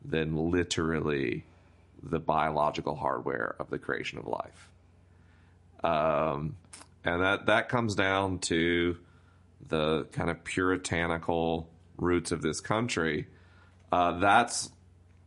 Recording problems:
garbled, watery; slightly; nothing above 10.5 kHz

